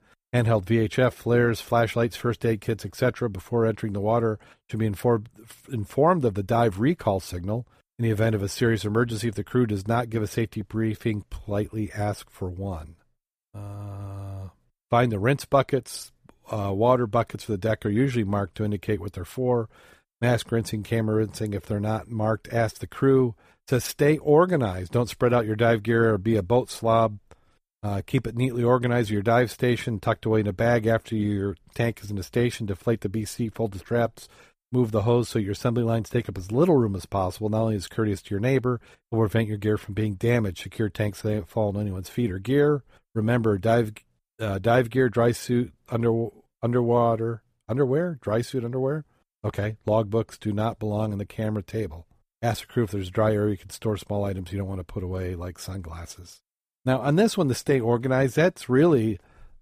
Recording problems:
none

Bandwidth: 14.5 kHz